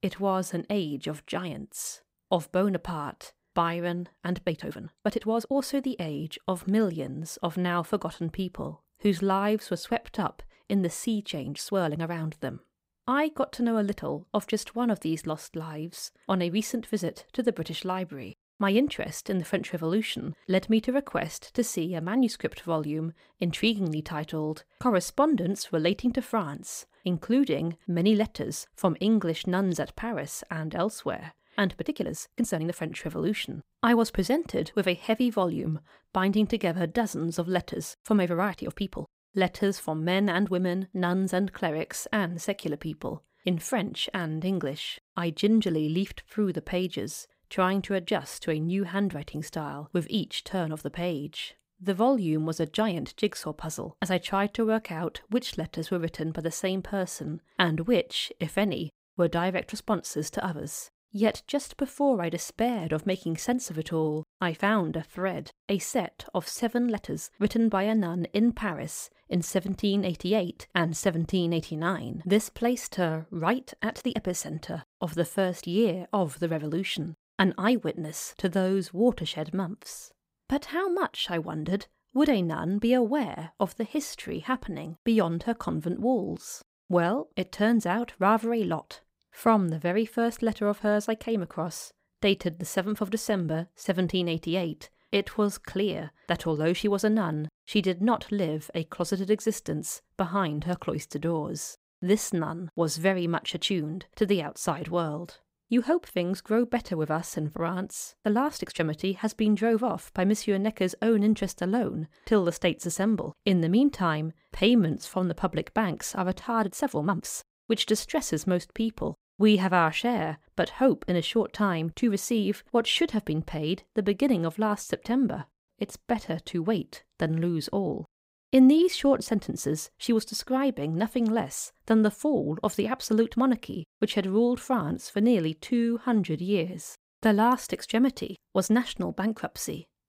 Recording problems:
uneven, jittery; strongly; from 4.5 s to 2:19

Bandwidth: 15.5 kHz